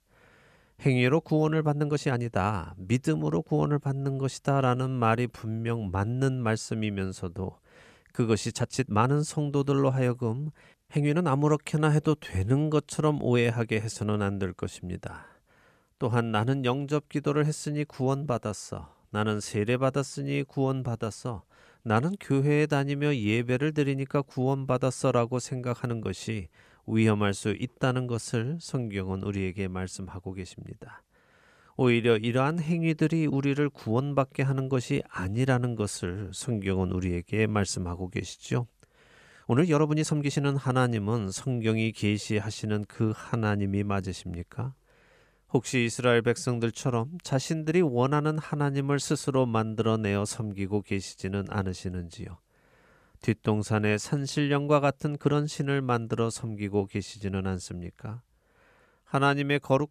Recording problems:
uneven, jittery; strongly; from 1.5 to 55 s

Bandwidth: 14.5 kHz